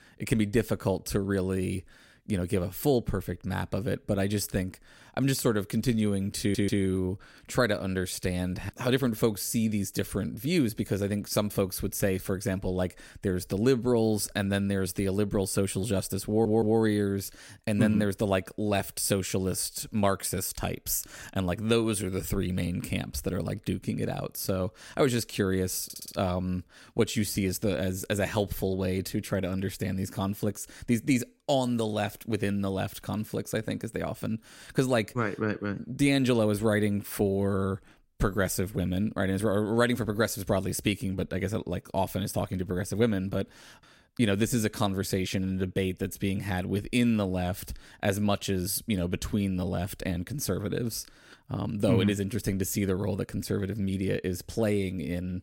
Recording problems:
audio stuttering; at 6.5 s, at 16 s and at 26 s

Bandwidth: 16 kHz